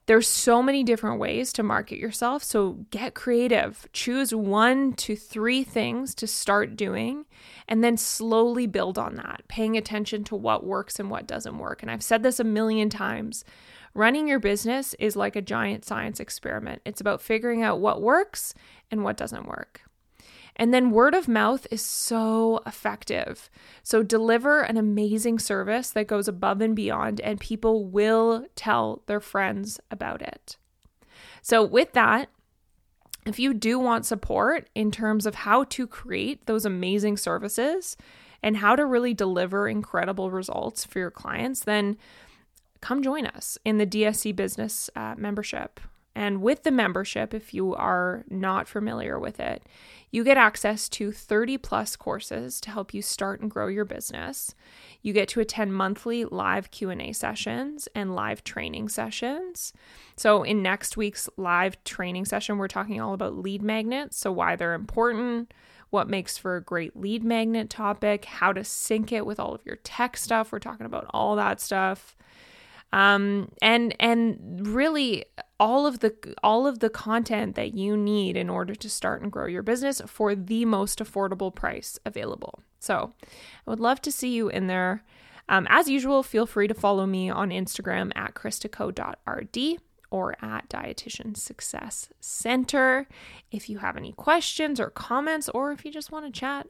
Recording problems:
none

